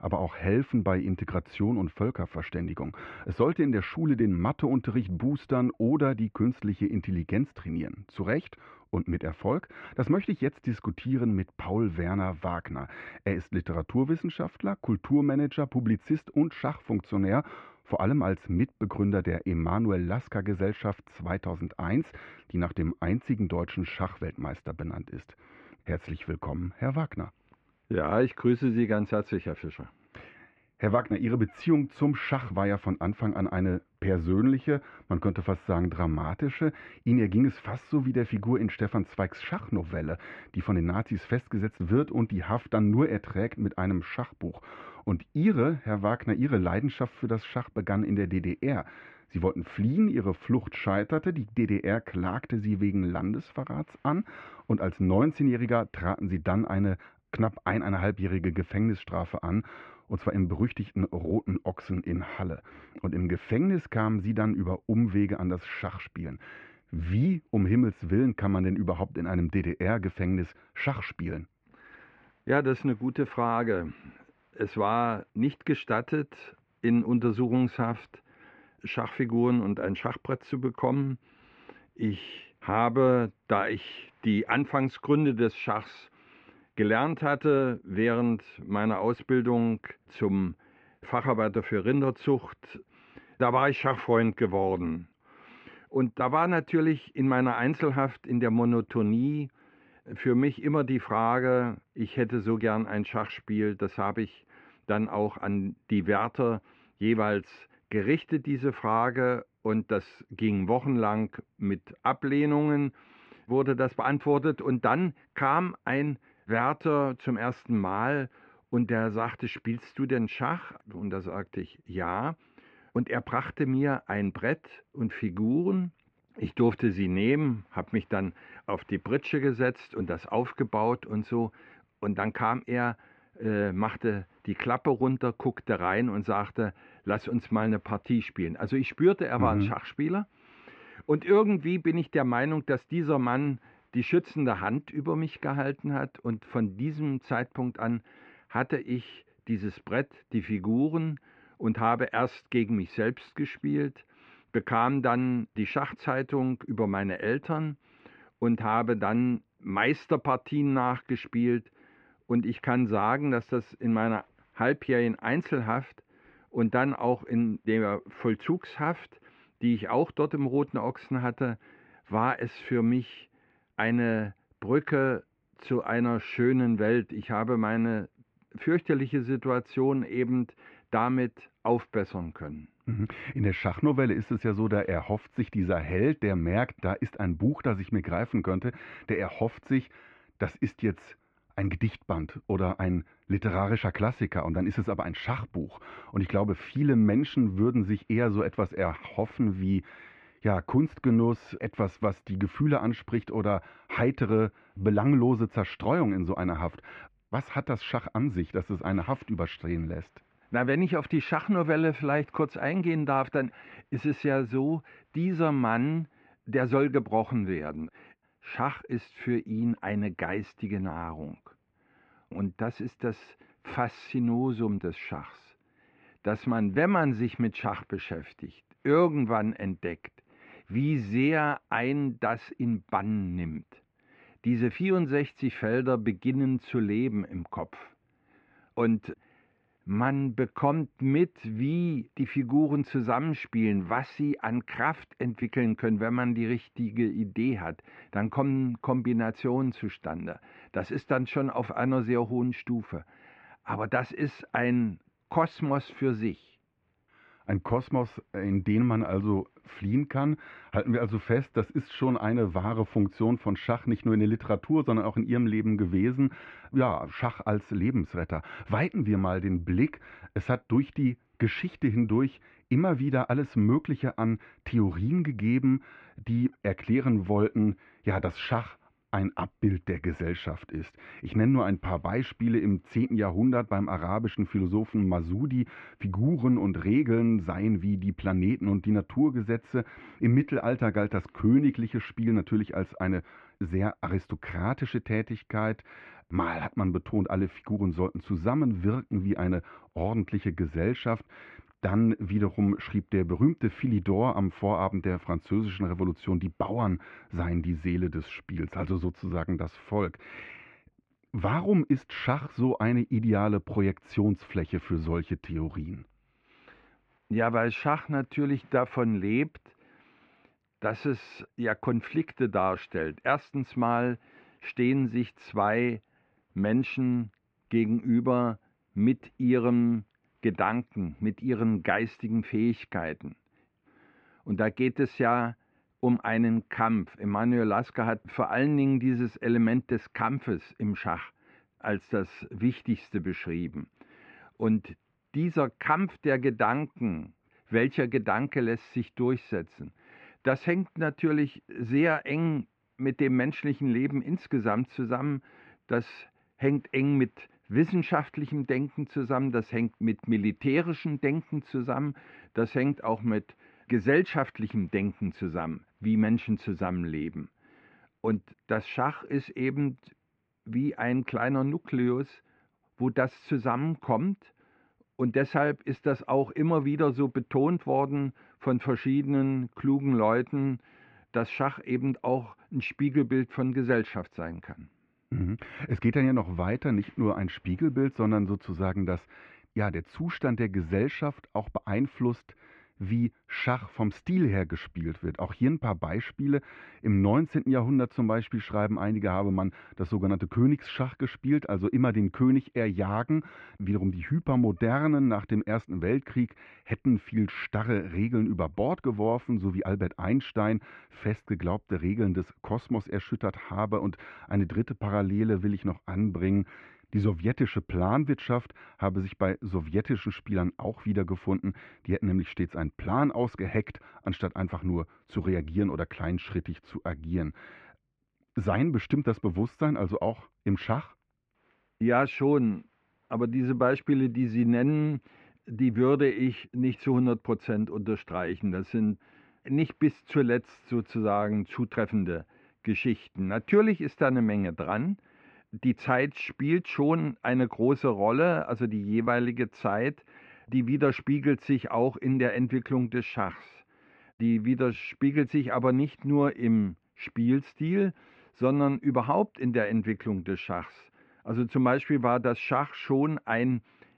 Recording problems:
muffled; very; fading above 2.5 kHz

